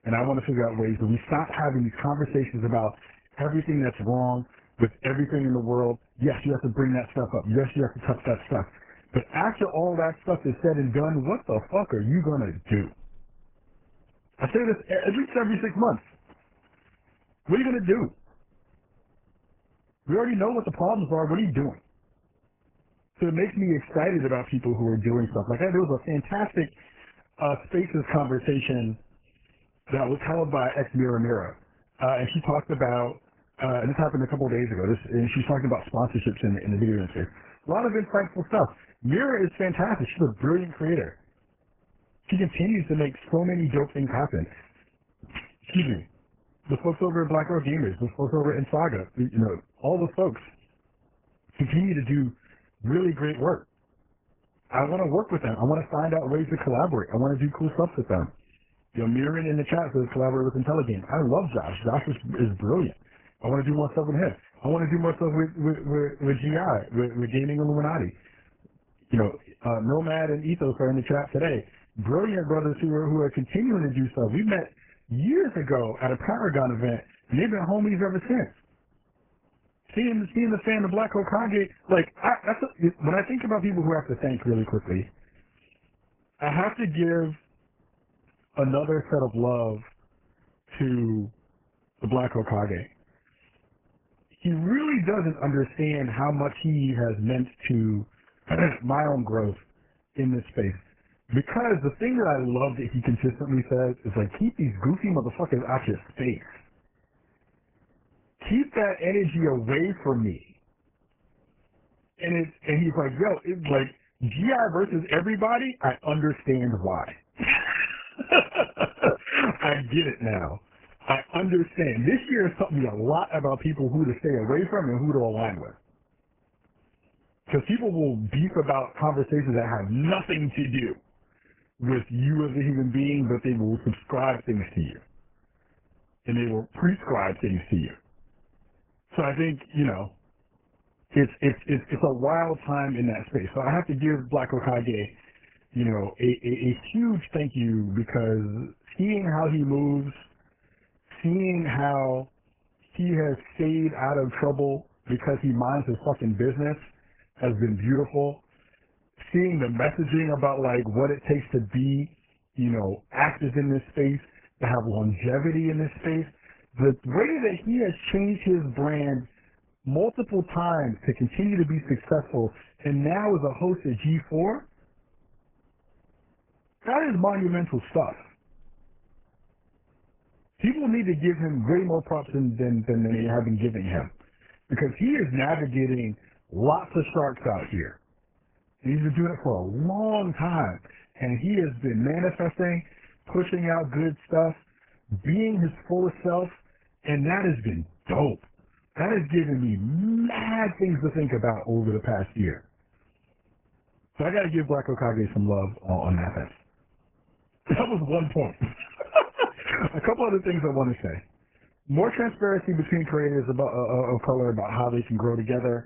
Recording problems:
garbled, watery; badly; nothing above 3 kHz

